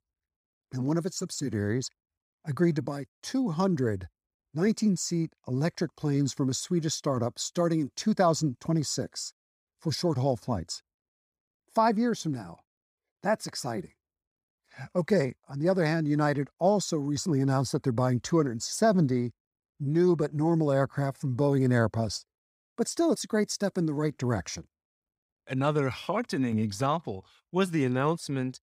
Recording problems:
none

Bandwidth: 15.5 kHz